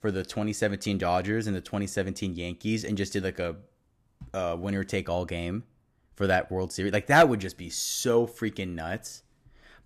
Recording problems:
none

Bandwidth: 14.5 kHz